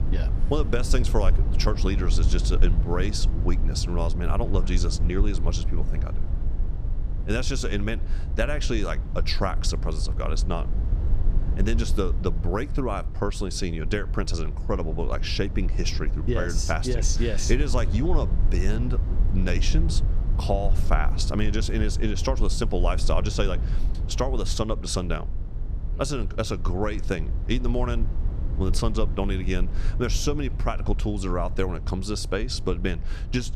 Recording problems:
low rumble; noticeable; throughout; 15 dB below the speech

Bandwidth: 14.5 kHz